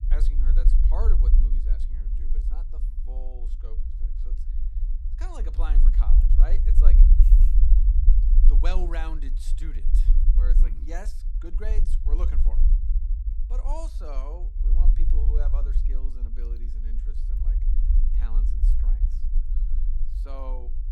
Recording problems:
low rumble; loud; throughout; 6 dB below the speech

